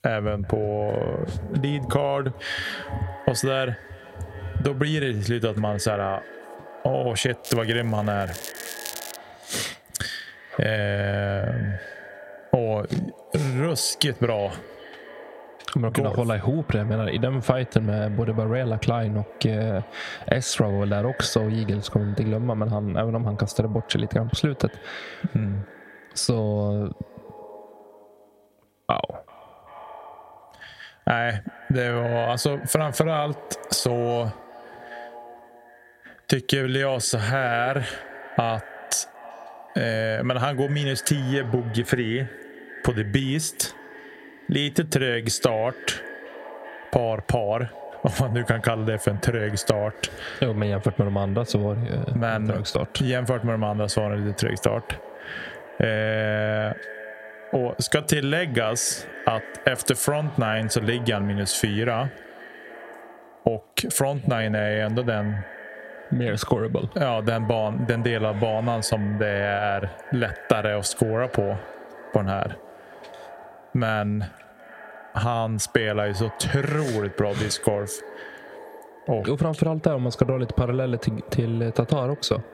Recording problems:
squashed, flat; heavily
echo of what is said; noticeable; throughout; 380 ms later, 15 dB below the speech
crackling; noticeable; from 7.5 to 9 s; 10 dB below the speech

